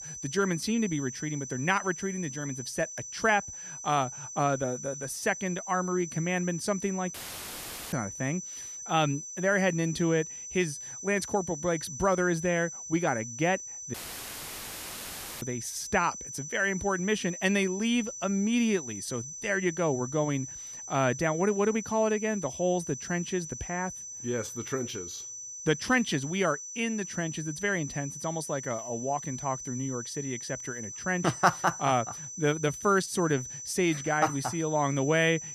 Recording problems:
high-pitched whine; loud; throughout; 6 kHz, 9 dB below the speech
audio cutting out; filled with static; at 7 s for 1 s and at 14 s for 1.5 s

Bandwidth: 14.5 kHz